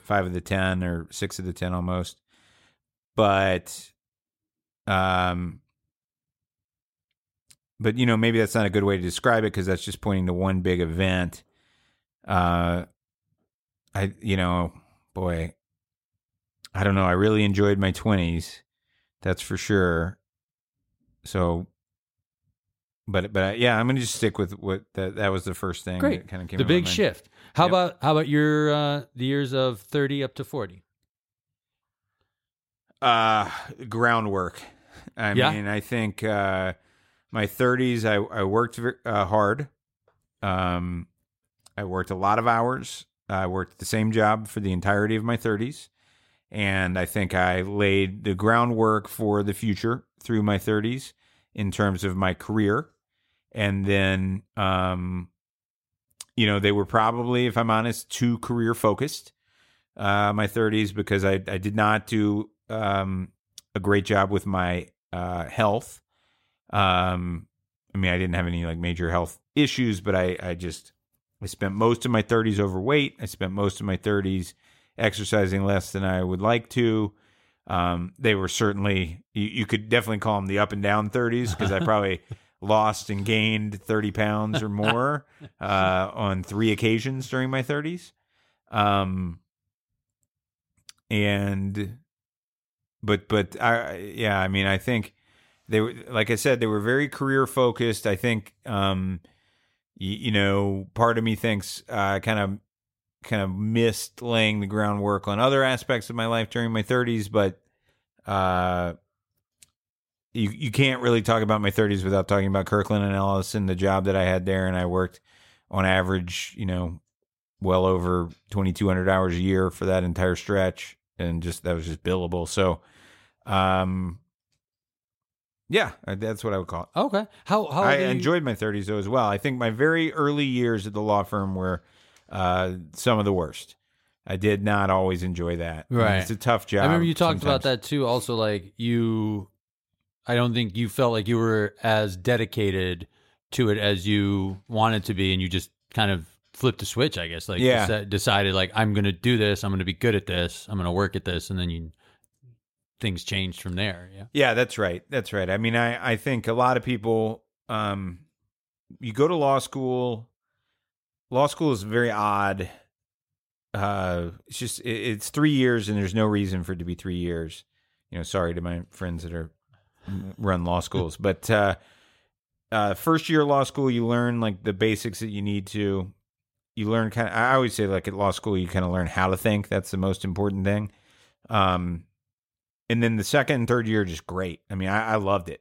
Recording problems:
none

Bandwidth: 16 kHz